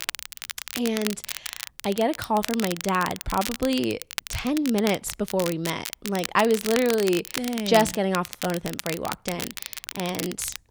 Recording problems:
crackle, like an old record; loud; 8 dB below the speech

